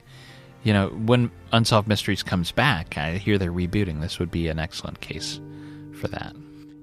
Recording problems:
background music; faint; throughout; 20 dB below the speech

